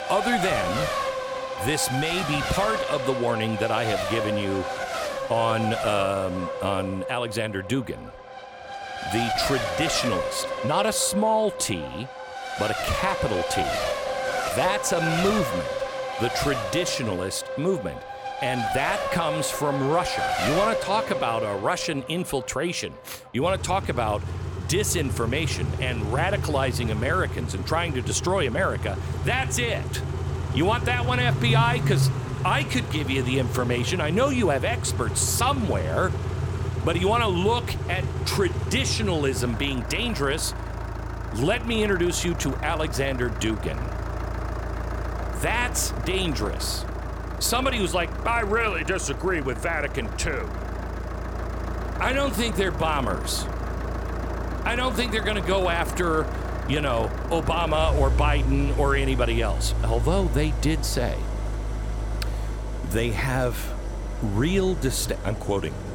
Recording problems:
traffic noise; loud; throughout; 3 dB below the speech

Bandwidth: 17 kHz